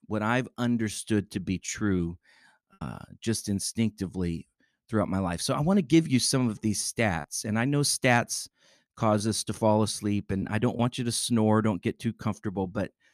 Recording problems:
choppy; occasionally; 2% of the speech affected

